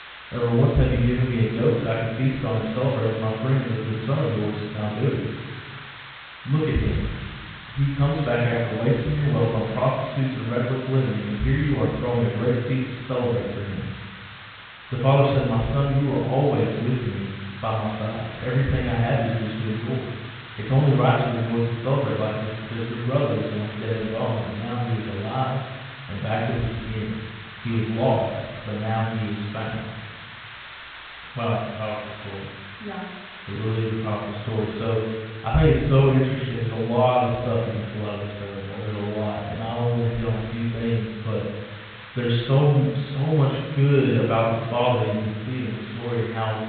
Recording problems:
room echo; strong; dies away in 1 s
off-mic speech; far
high frequencies cut off; severe; nothing above 4 kHz
hiss; noticeable; throughout; 15 dB below the speech

